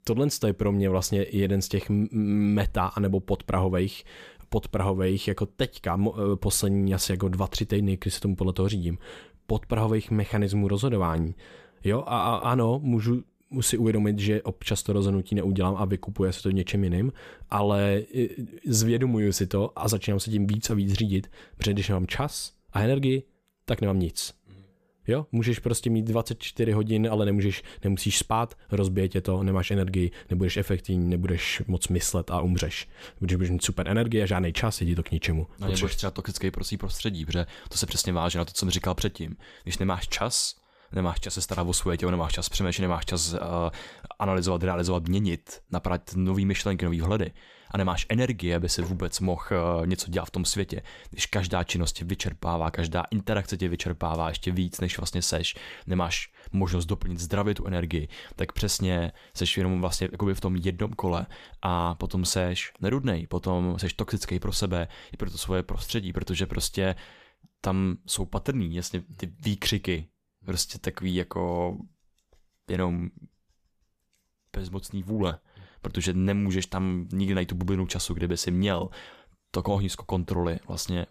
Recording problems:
none

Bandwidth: 14.5 kHz